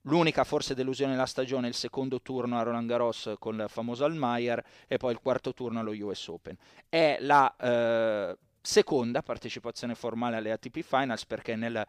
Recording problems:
none

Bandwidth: 15 kHz